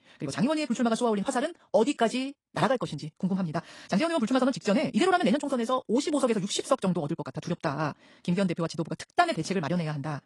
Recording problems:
wrong speed, natural pitch; too fast; 1.8 times normal speed
garbled, watery; slightly; nothing above 10 kHz

